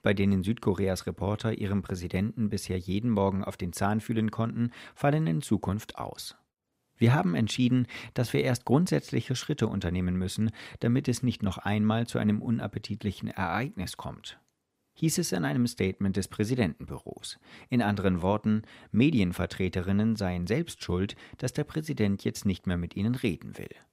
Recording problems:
none

